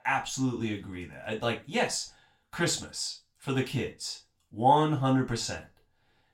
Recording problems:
off-mic speech; far
room echo; very slight; dies away in 0.3 s

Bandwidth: 16 kHz